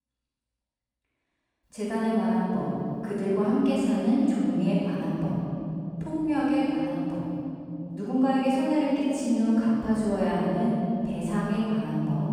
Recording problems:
room echo; strong; dies away in 3 s
off-mic speech; far

